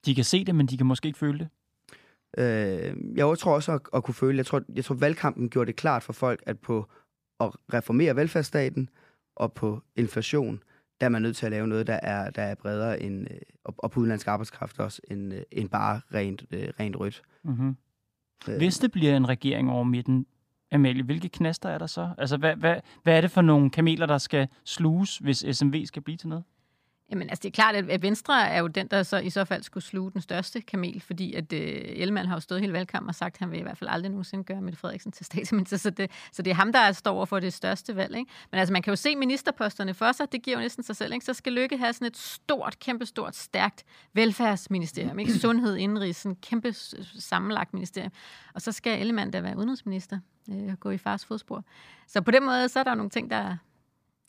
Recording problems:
none

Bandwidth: 15 kHz